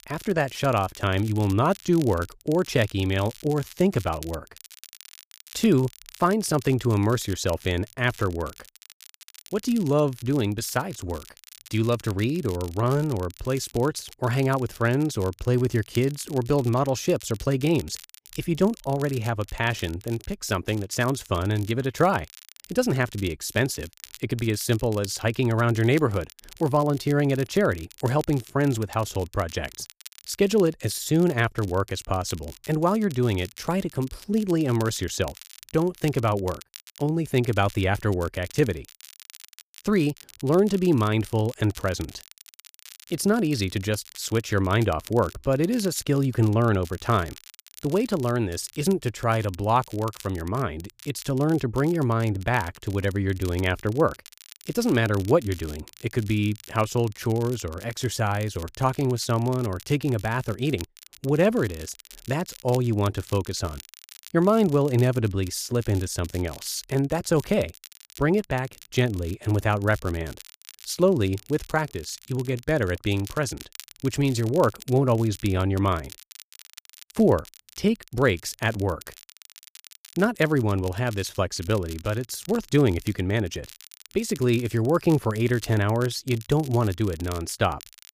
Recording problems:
crackle, like an old record; faint; 20 dB below the speech

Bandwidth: 15 kHz